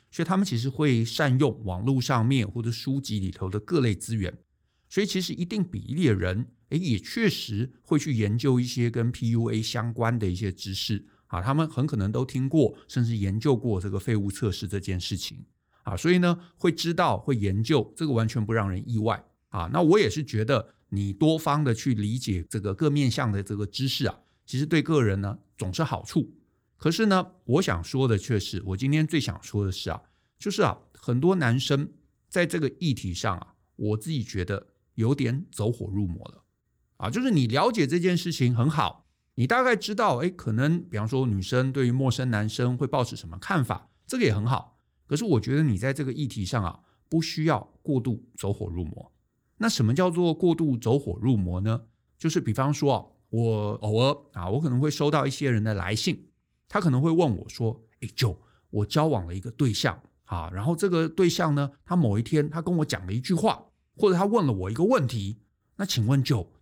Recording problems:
none

